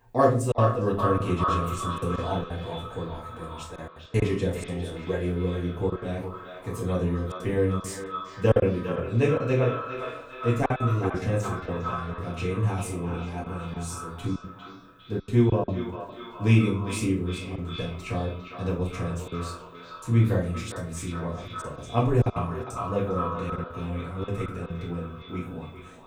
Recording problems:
echo of what is said; strong; throughout; 400 ms later, 9 dB below the speech
off-mic speech; far
room echo; slight; dies away in 0.4 s
choppy; very; 7% of the speech affected

